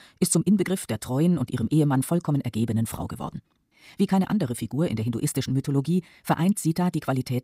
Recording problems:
wrong speed, natural pitch; too fast; 1.5 times normal speed

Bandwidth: 15.5 kHz